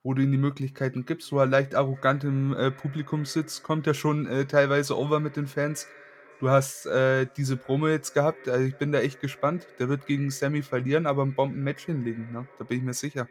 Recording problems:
echo of what is said; faint; throughout; 550 ms later, 25 dB below the speech

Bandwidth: 17.5 kHz